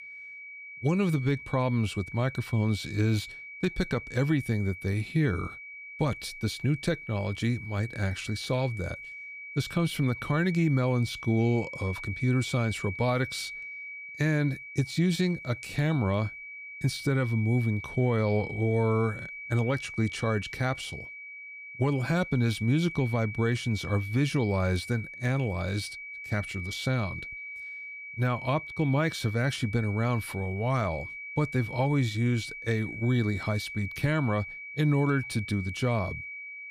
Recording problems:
high-pitched whine; noticeable; throughout; 2.5 kHz, 10 dB below the speech

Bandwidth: 15.5 kHz